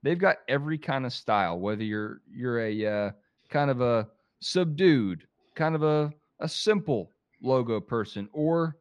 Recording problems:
muffled; very slightly; fading above 3.5 kHz

